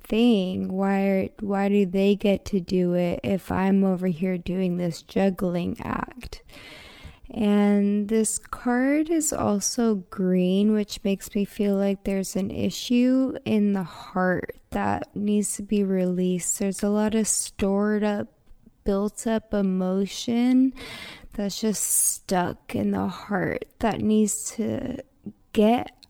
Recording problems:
wrong speed, natural pitch; too slow; 0.6 times normal speed

